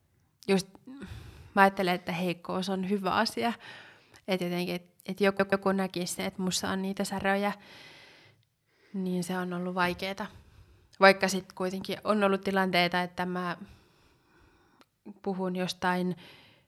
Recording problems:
audio stuttering; at 5.5 s

